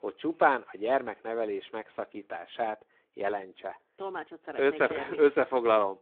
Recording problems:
phone-call audio

